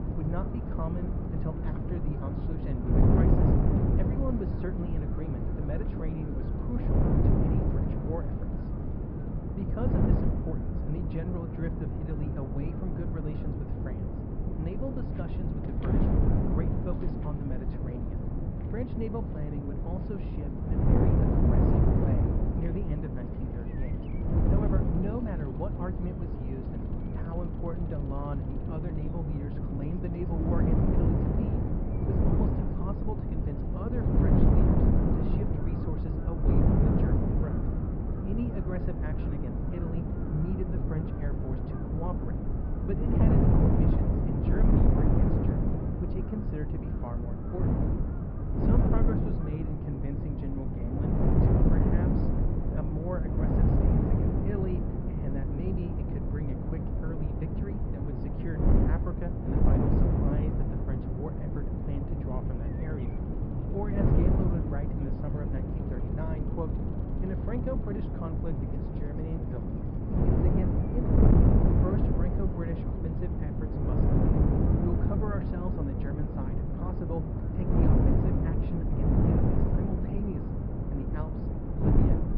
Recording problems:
high frequencies cut off; noticeable; nothing above 5.5 kHz
muffled; very slightly; fading above 3 kHz
wind noise on the microphone; heavy; 5 dB above the speech
animal sounds; faint; throughout; 25 dB below the speech
rain or running water; faint; until 32 s; 20 dB below the speech

